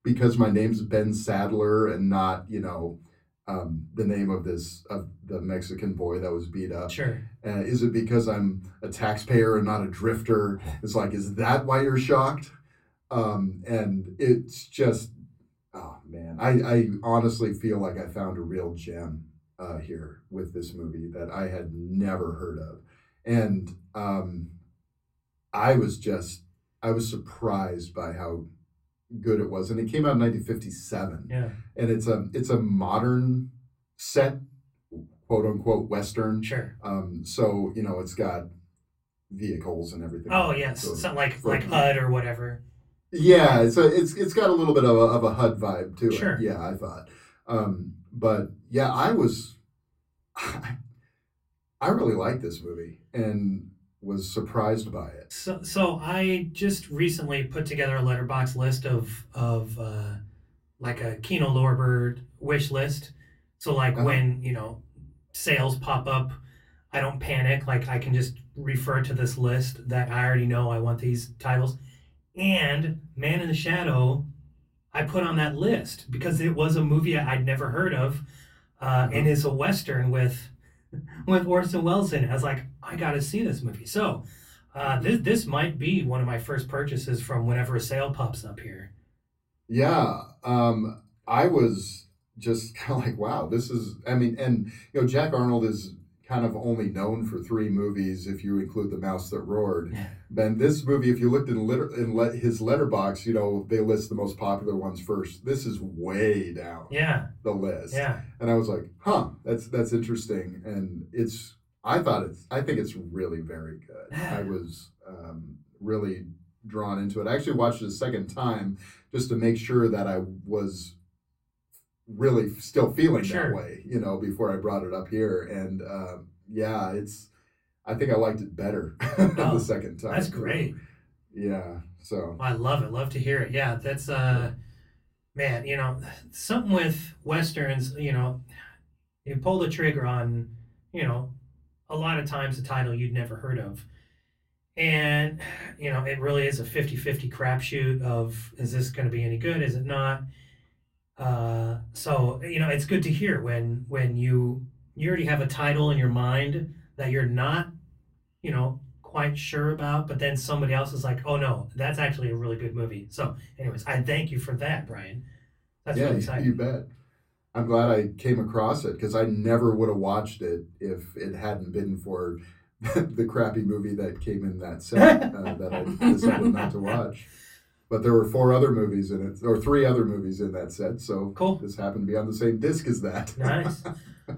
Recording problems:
off-mic speech; far
room echo; very slight; dies away in 0.3 s

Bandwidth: 16 kHz